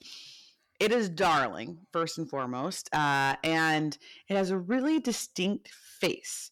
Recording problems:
distortion; heavy; 7 dB below the speech

